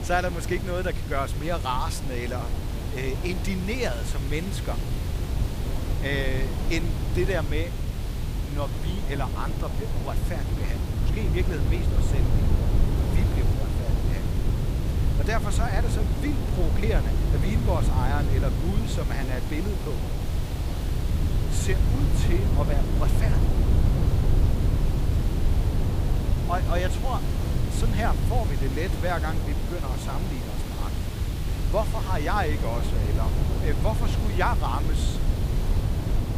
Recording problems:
wind noise on the microphone; heavy; 6 dB below the speech
hiss; loud; throughout; 8 dB below the speech
rain or running water; very faint; throughout; 30 dB below the speech

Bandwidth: 15 kHz